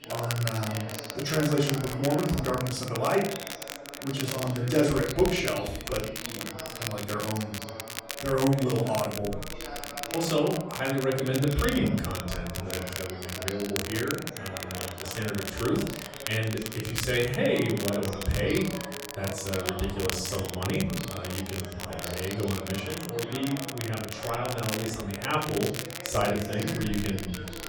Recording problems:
off-mic speech; far
room echo; noticeable; dies away in 0.6 s
crackle, like an old record; loud; 7 dB below the speech
background chatter; noticeable; throughout; 3 voices, 10 dB below the speech

